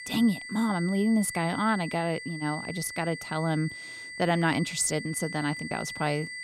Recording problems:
high-pitched whine; loud; throughout; 2 kHz, 9 dB below the speech

